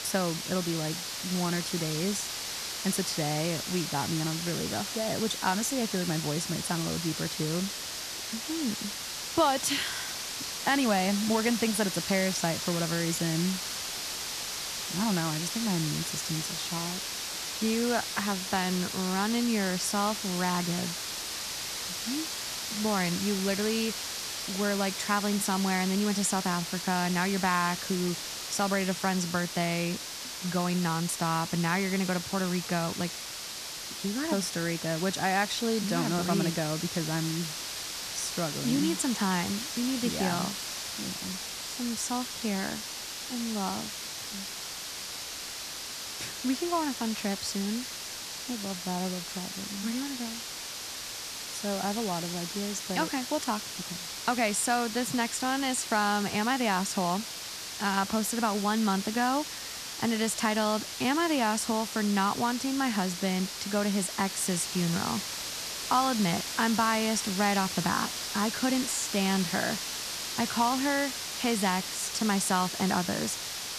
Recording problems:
hiss; loud; throughout; 4 dB below the speech

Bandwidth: 14 kHz